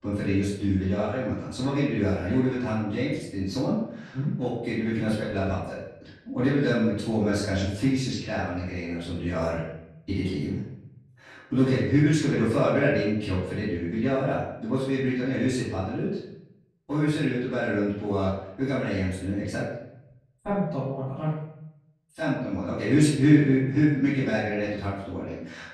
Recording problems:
off-mic speech; far
room echo; noticeable; dies away in 0.7 s

